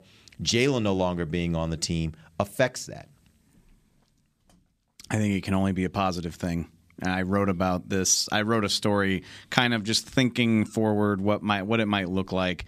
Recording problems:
none

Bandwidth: 14.5 kHz